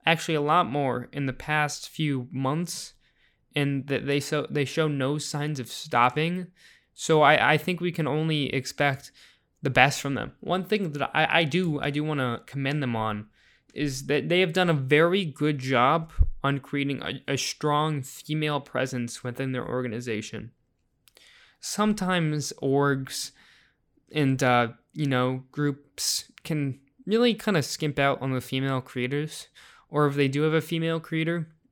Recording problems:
none

